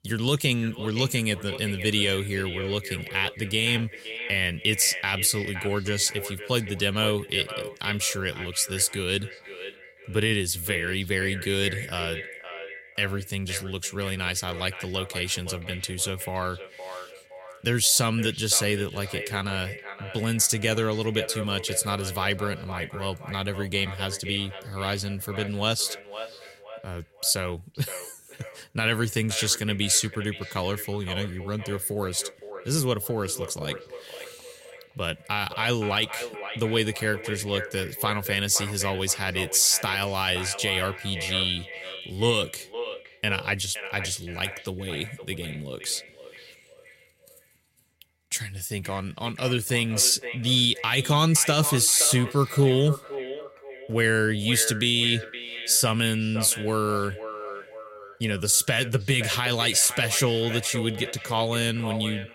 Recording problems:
echo of what is said; noticeable; throughout; 520 ms later, 15 dB below the speech

